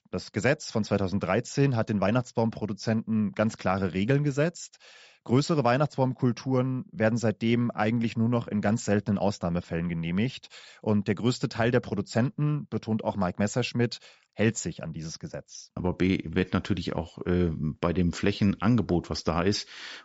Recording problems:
high frequencies cut off; noticeable; nothing above 8 kHz

